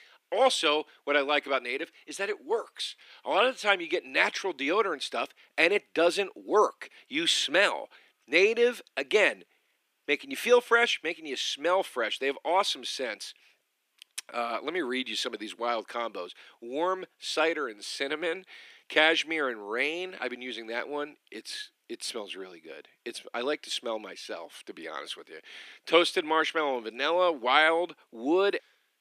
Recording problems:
thin; somewhat; fading below 300 Hz

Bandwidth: 15 kHz